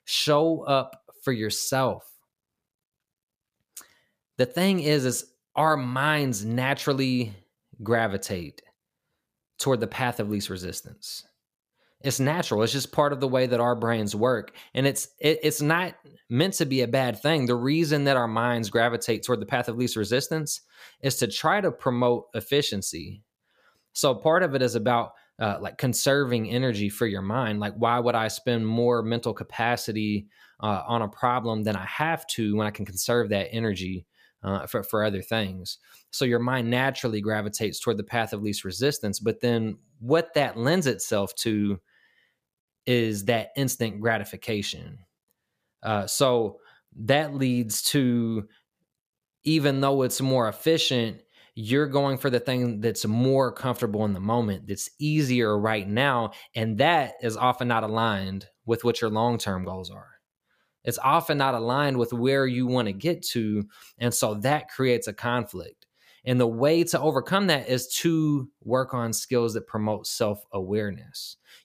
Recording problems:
none

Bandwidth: 15 kHz